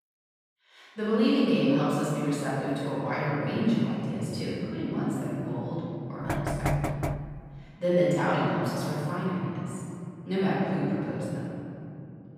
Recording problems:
room echo; strong; dies away in 2.9 s
off-mic speech; far
door banging; noticeable; from 6.5 to 7.5 s; peak level with the speech

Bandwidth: 15 kHz